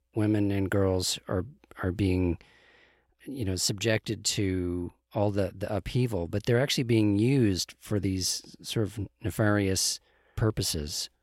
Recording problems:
none

